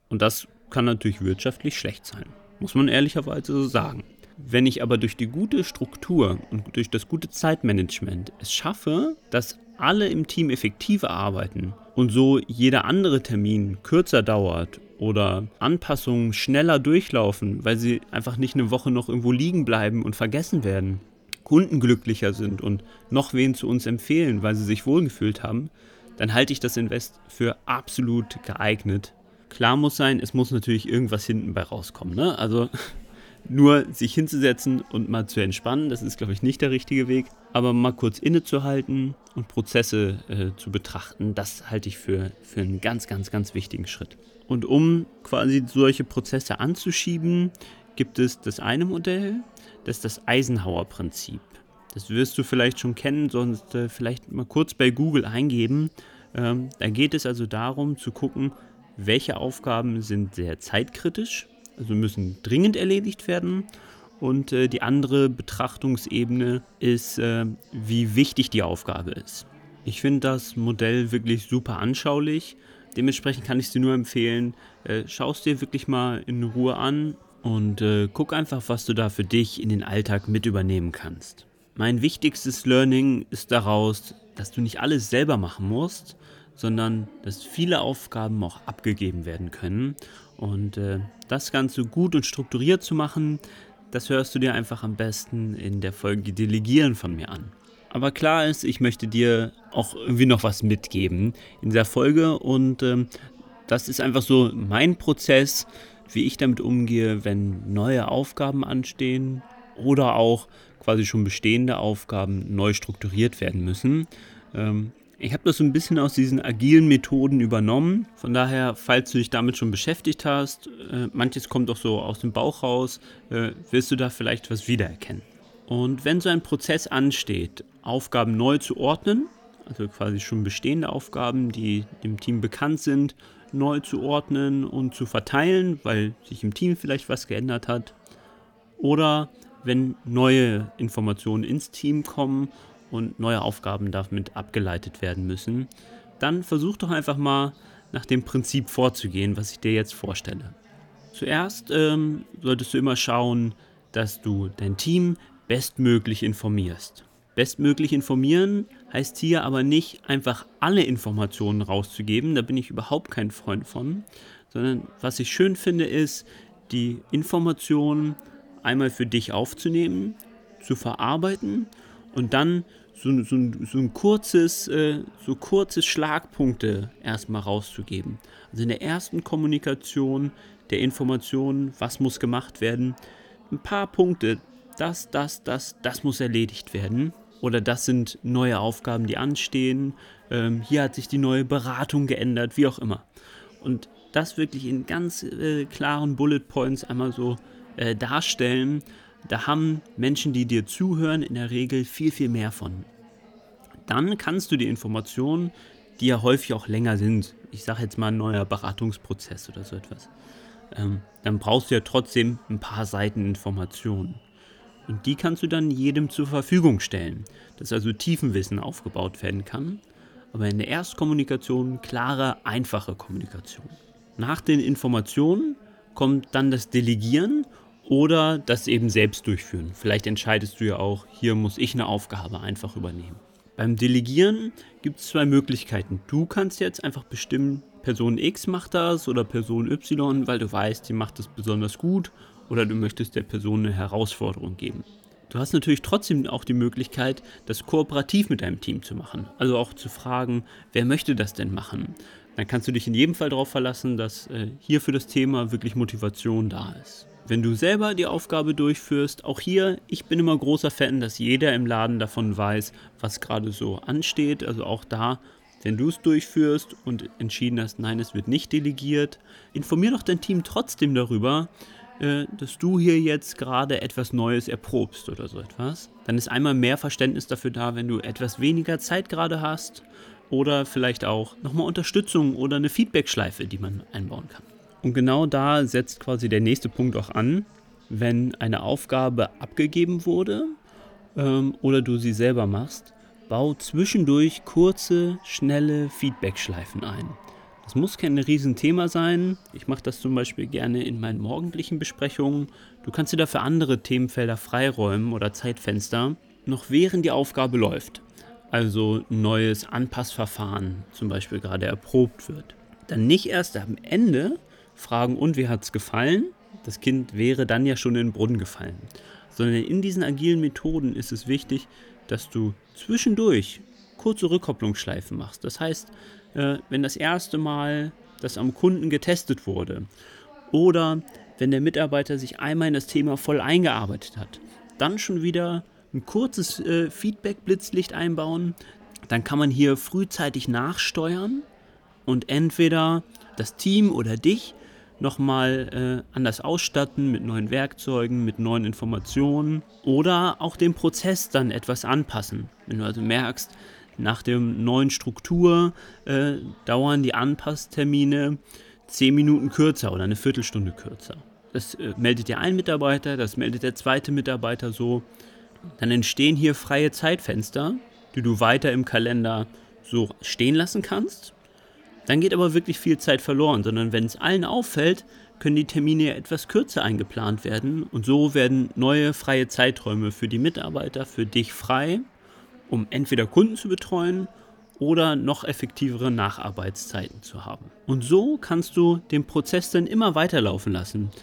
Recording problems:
chatter from many people; faint; throughout; 30 dB below the speech

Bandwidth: 18.5 kHz